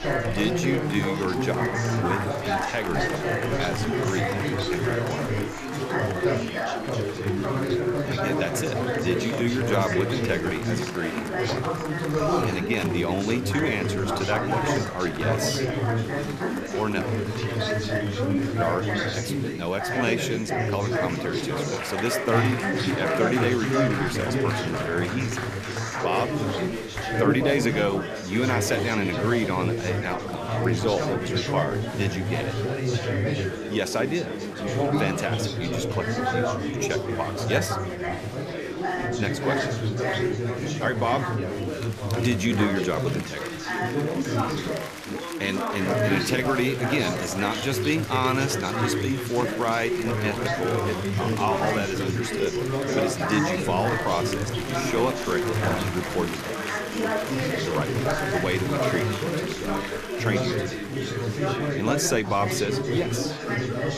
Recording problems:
chatter from many people; very loud; throughout; 1 dB above the speech

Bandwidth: 14.5 kHz